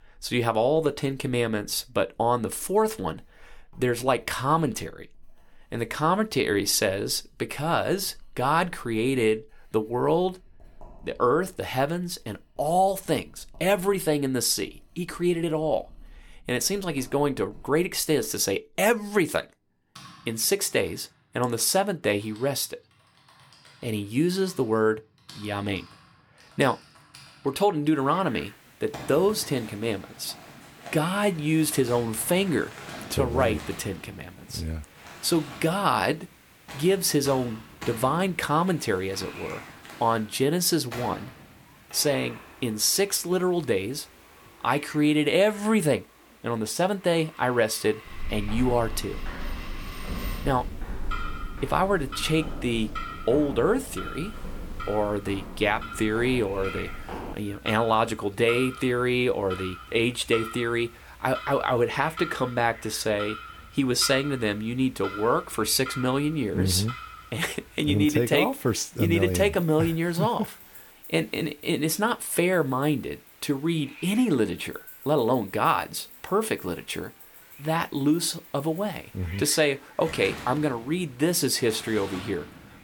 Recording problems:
household noises; noticeable; throughout; 15 dB below the speech
hiss; faint; from 28 s on; 25 dB below the speech
footsteps; noticeable; from 48 to 57 s; peak 9 dB below the speech

